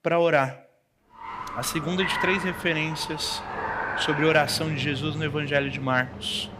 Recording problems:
traffic noise; loud; from 1.5 s on; 7 dB below the speech

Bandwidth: 15 kHz